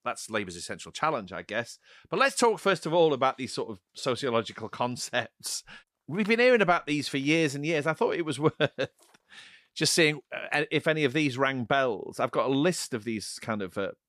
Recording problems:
none

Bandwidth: 14.5 kHz